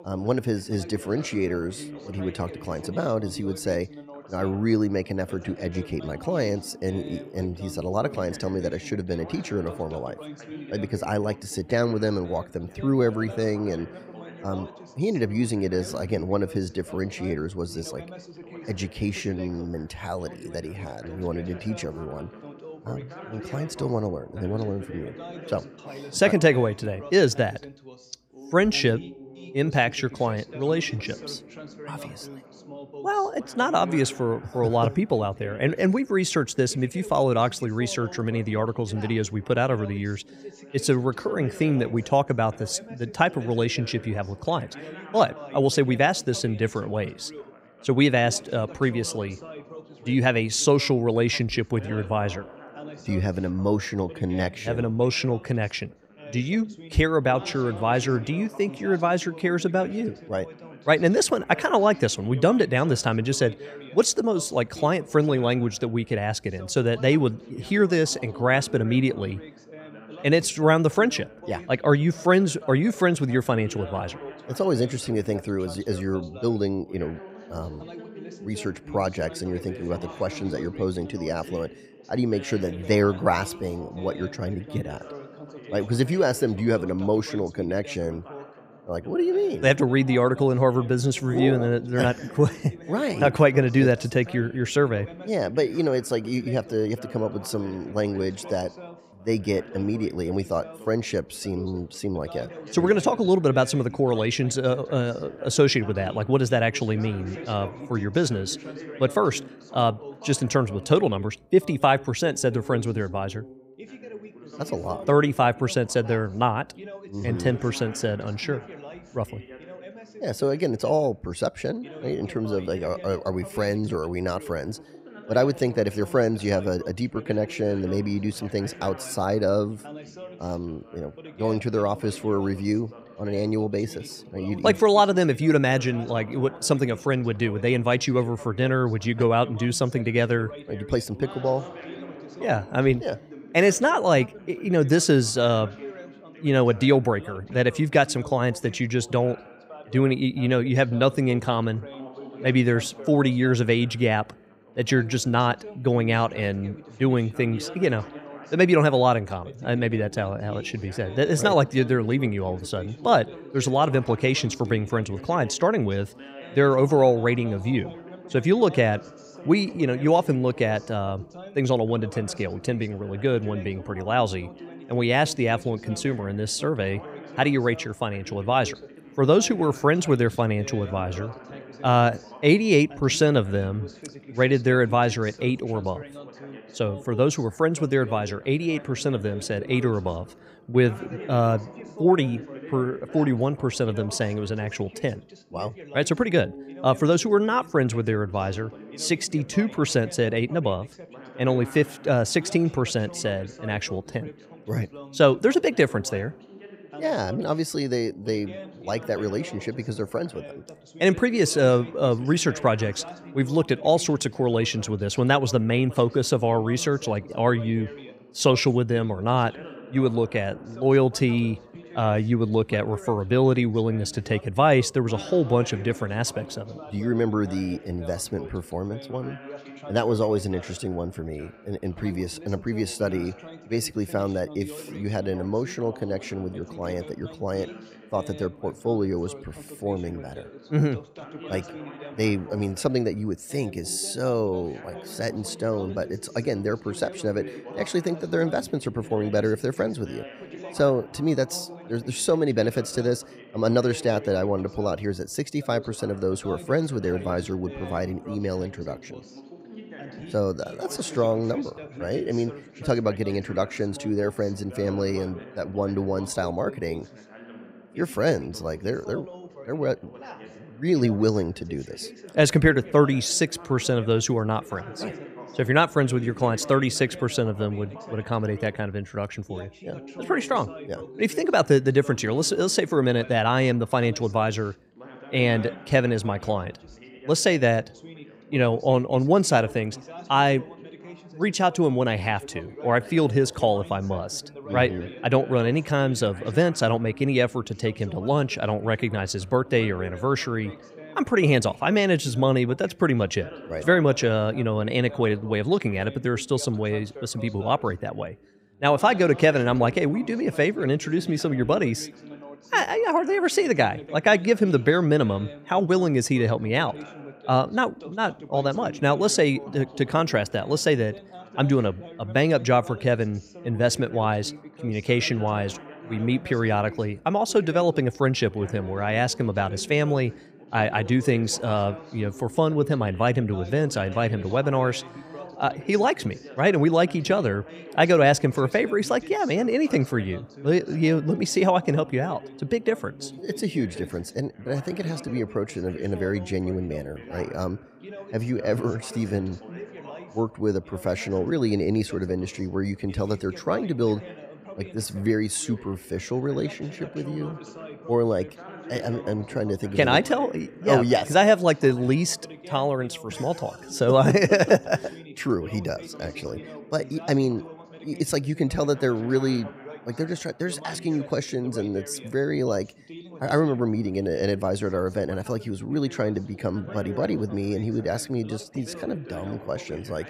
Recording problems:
background chatter; noticeable; throughout; 2 voices, 15 dB below the speech

